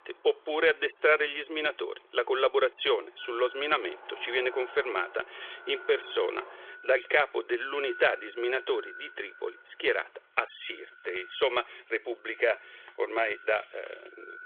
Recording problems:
echo of what is said; faint; from 3 s on; 190 ms later, 20 dB below the speech
phone-call audio; nothing above 3.5 kHz
traffic noise; faint; until 10 s; 20 dB below the speech

